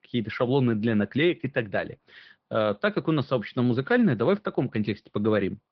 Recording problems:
high frequencies cut off; noticeable; nothing above 5.5 kHz
garbled, watery; slightly

